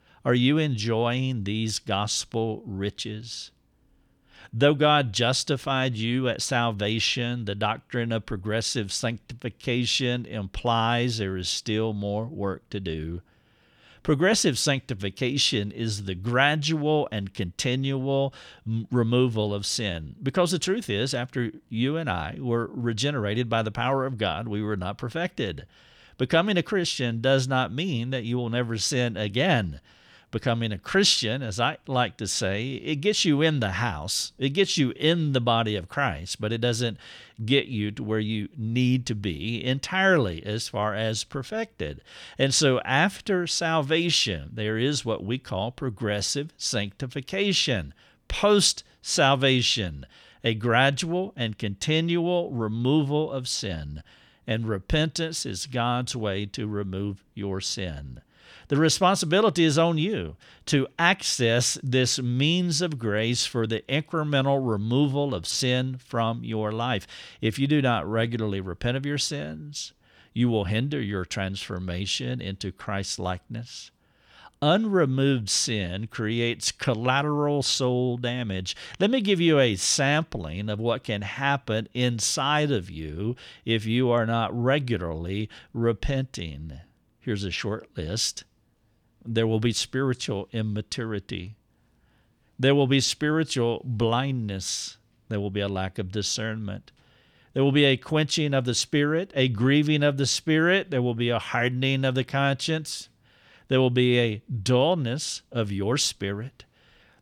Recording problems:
none

